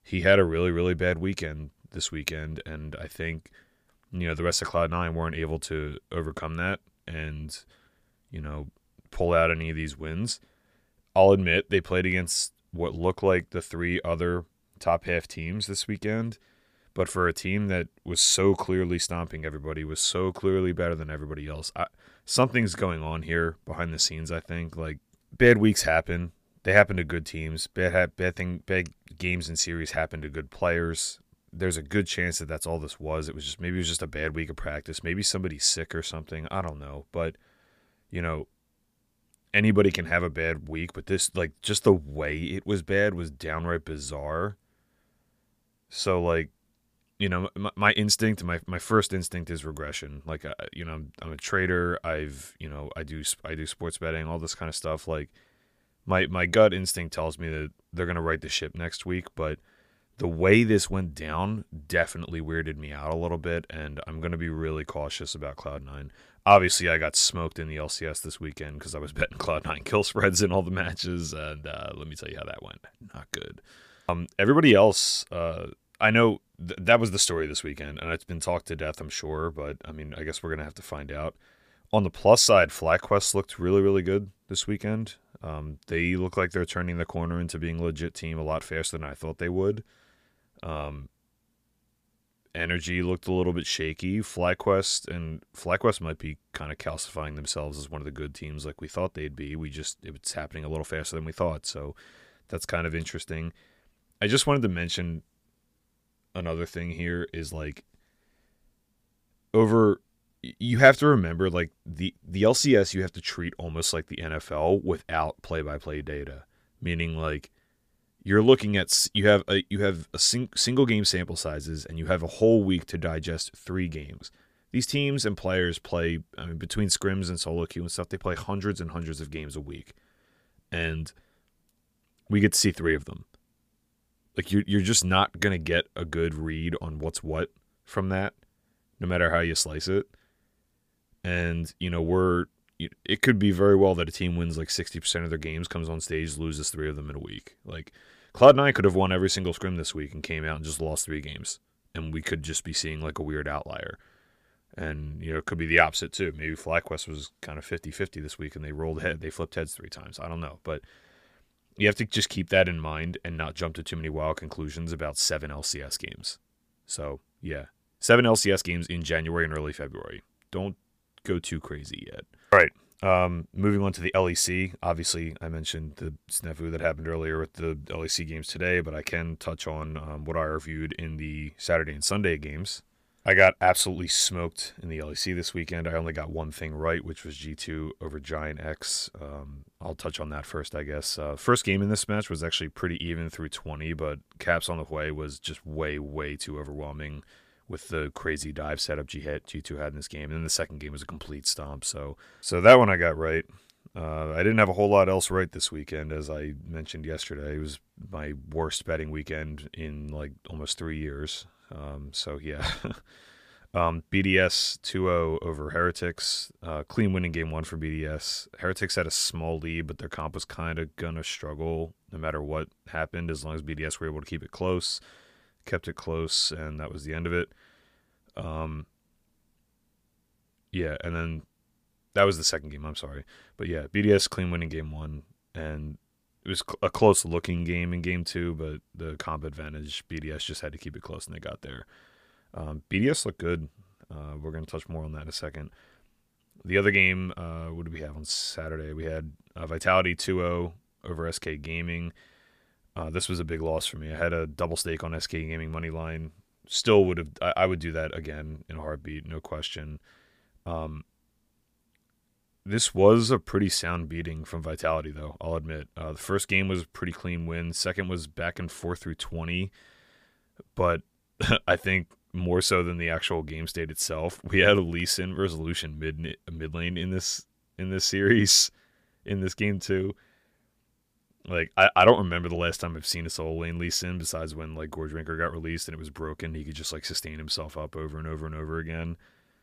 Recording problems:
none

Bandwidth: 15 kHz